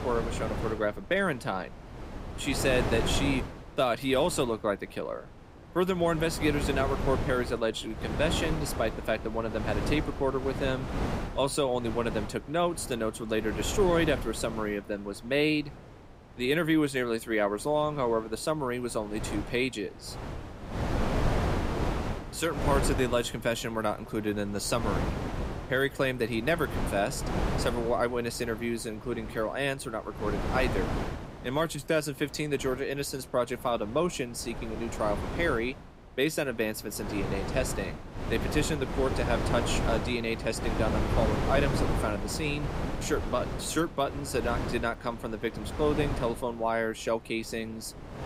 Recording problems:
wind noise on the microphone; heavy; 7 dB below the speech

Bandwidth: 15.5 kHz